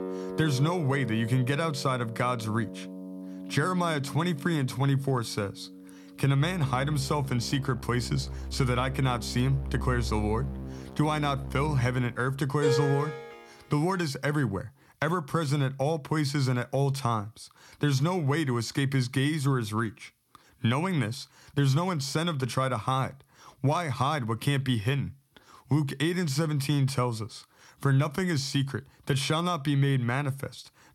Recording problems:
background music; loud; until 13 s; 10 dB below the speech

